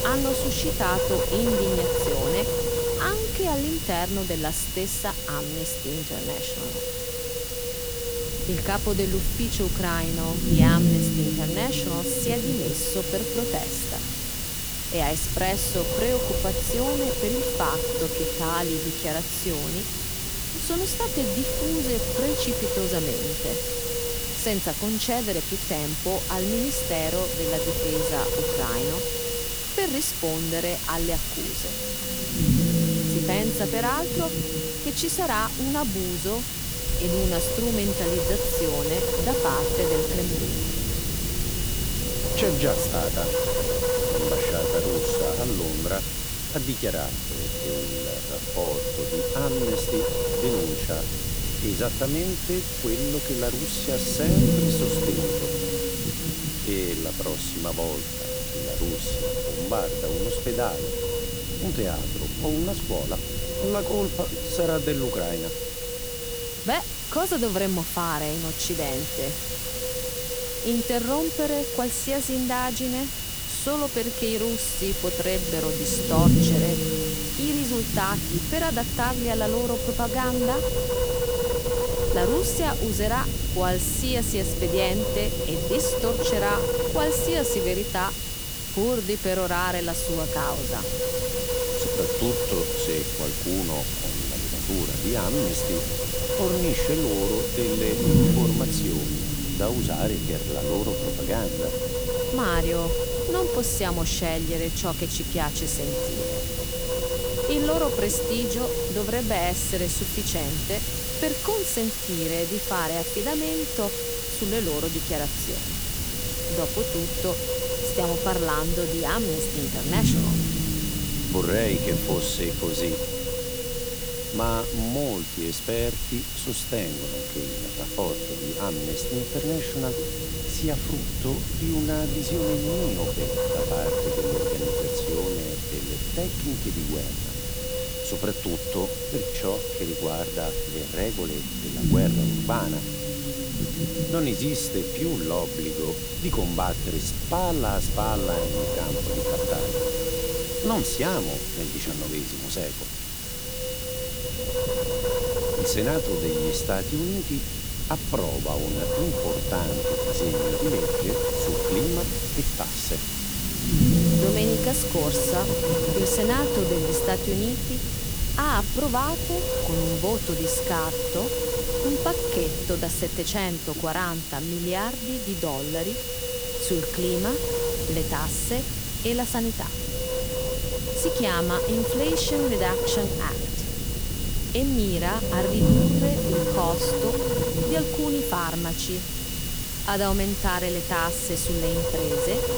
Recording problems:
wind noise on the microphone; heavy; 1 dB below the speech
hiss; loud; throughout; 1 dB below the speech
low rumble; loud; throughout; 9 dB below the speech
high-pitched whine; noticeable; throughout; 3 kHz, 10 dB below the speech

